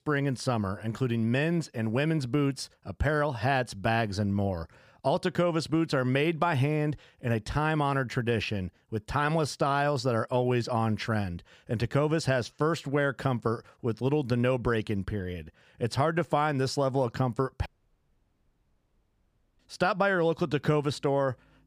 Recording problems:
audio cutting out; at 18 s for 2 s

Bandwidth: 15 kHz